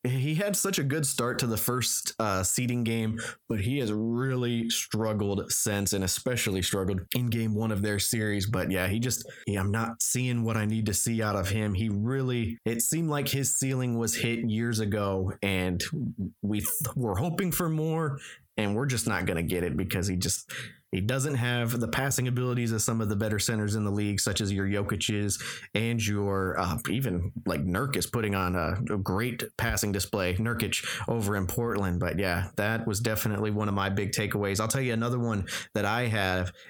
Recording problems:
squashed, flat; heavily

